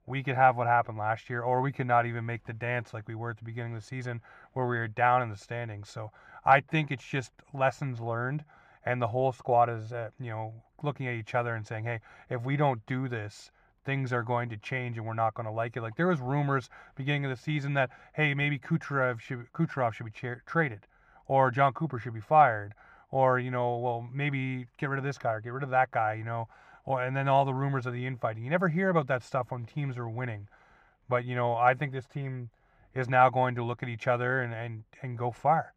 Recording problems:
muffled; very; fading above 4 kHz

